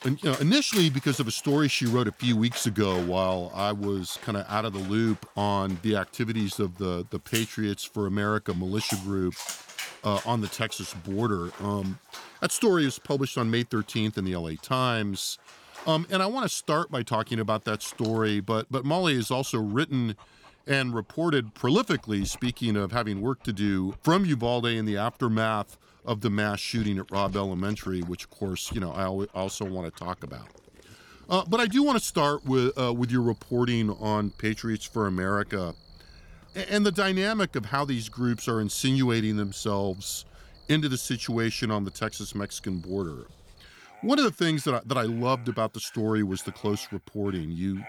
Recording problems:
animal sounds; noticeable; throughout; 20 dB below the speech

